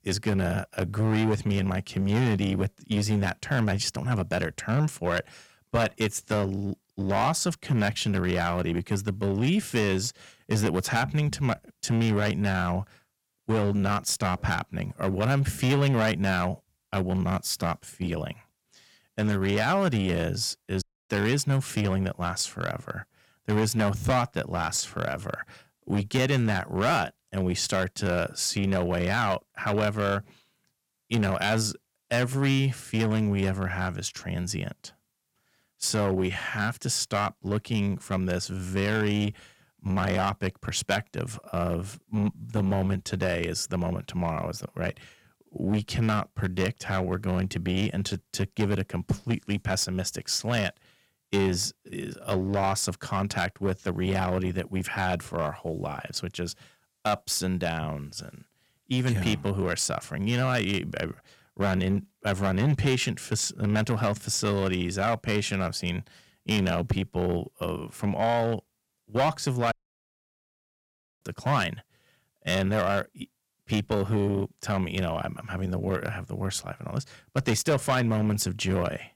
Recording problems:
distortion; slight; 7% of the sound clipped
audio cutting out; at 21 s and at 1:10 for 1.5 s

